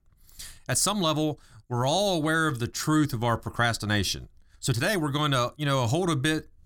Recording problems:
uneven, jittery; strongly; from 0.5 to 5 s

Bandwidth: 17.5 kHz